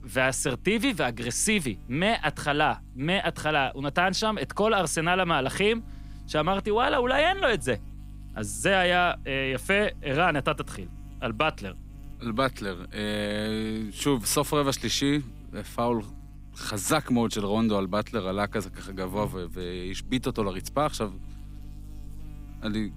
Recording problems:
electrical hum; faint; throughout; 50 Hz, 30 dB below the speech

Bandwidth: 15.5 kHz